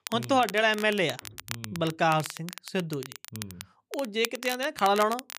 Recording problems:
crackle, like an old record; noticeable; 15 dB below the speech

